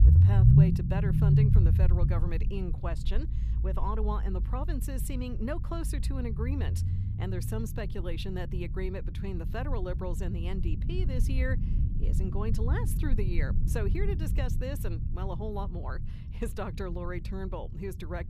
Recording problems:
low rumble; loud; throughout; 2 dB below the speech

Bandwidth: 14.5 kHz